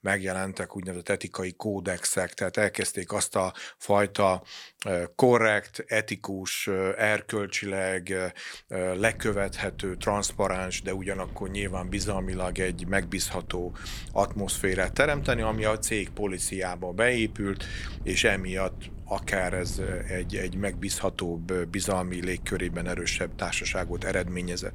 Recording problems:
wind noise on the microphone; occasional gusts; from 9 s on; 25 dB below the speech

